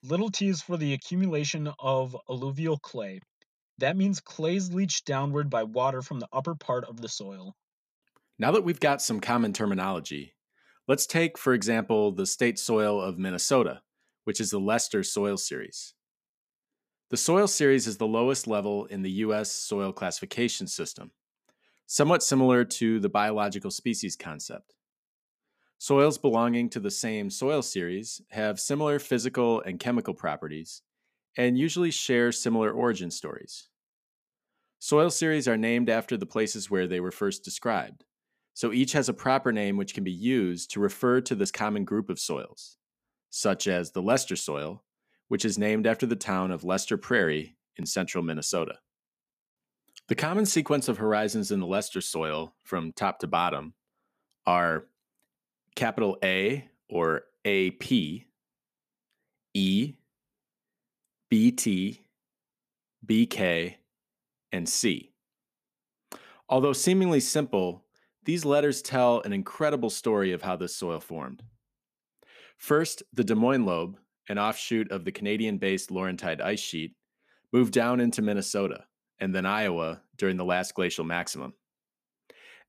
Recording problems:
none

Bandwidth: 14.5 kHz